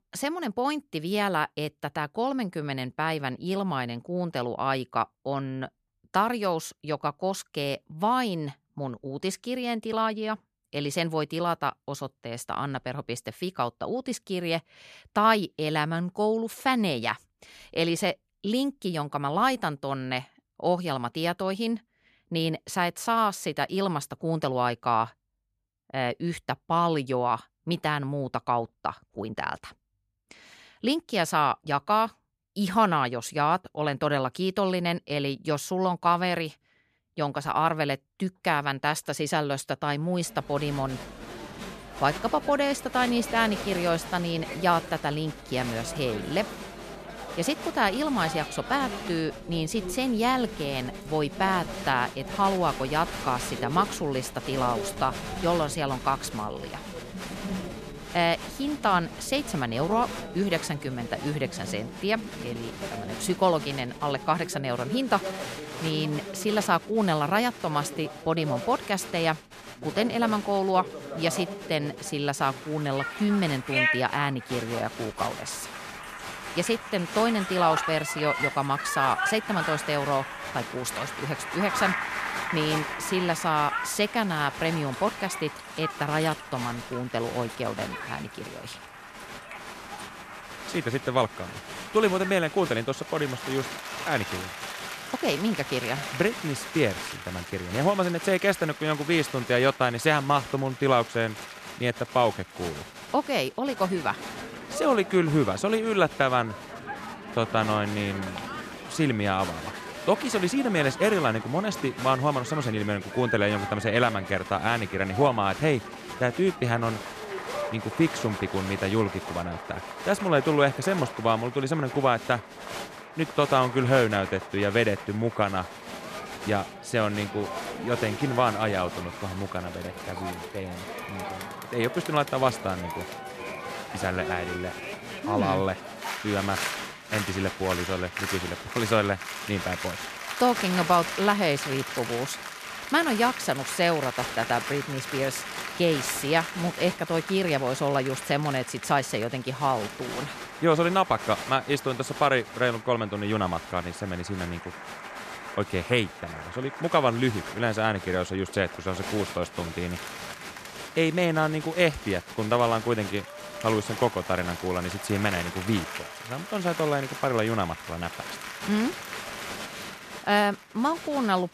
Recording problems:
crowd noise; loud; from 40 s on; 8 dB below the speech

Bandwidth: 14.5 kHz